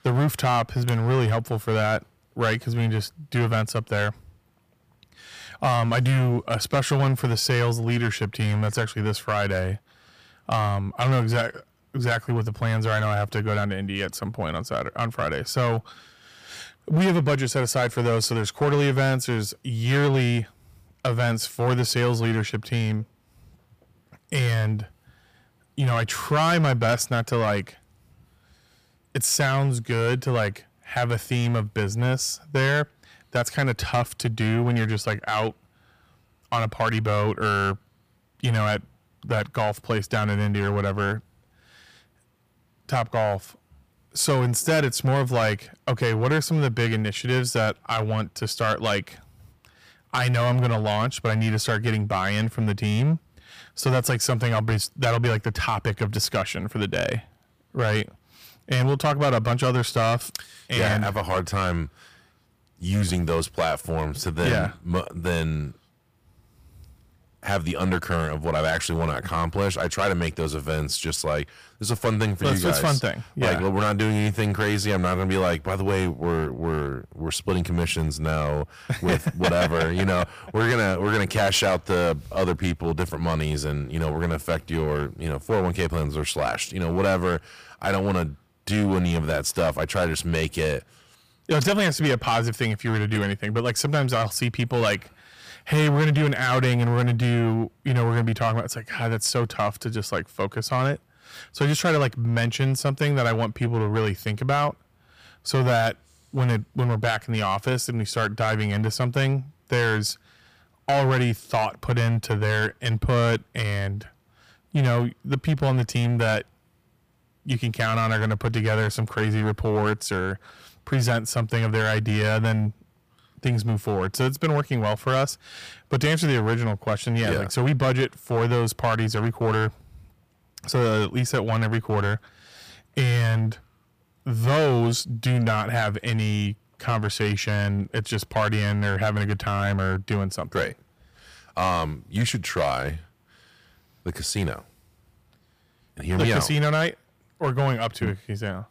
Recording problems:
distortion; slight; 7% of the sound clipped

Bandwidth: 15 kHz